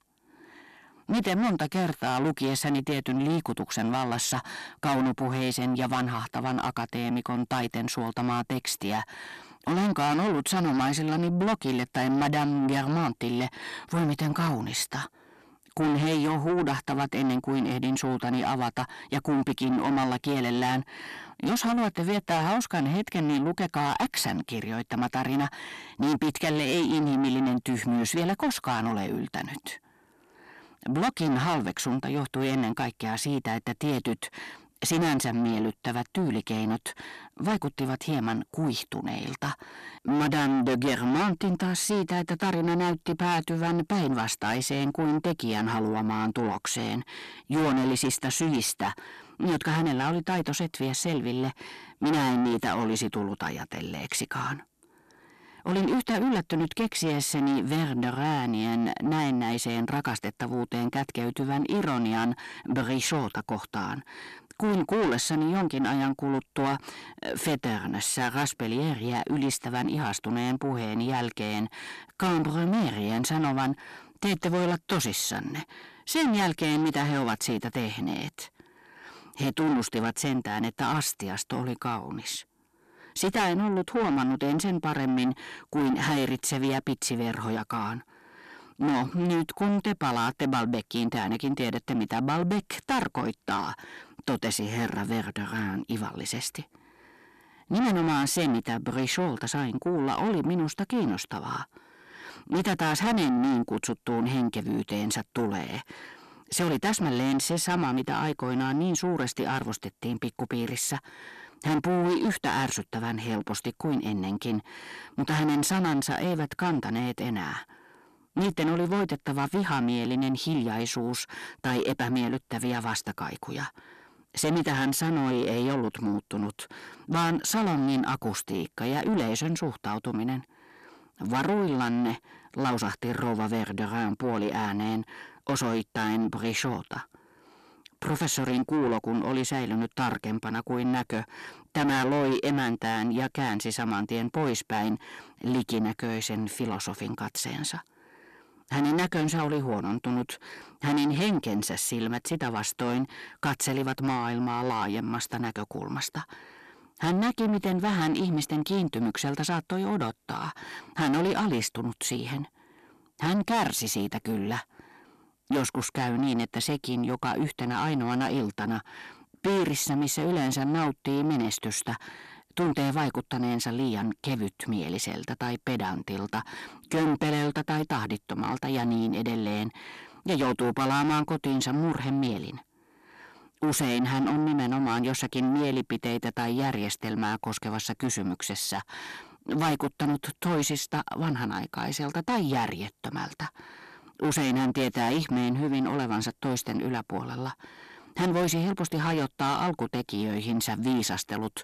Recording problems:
distortion; heavy; 6 dB below the speech

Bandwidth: 14 kHz